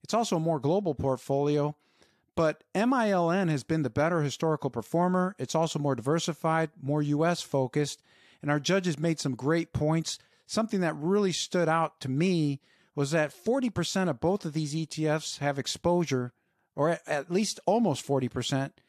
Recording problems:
none

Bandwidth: 14 kHz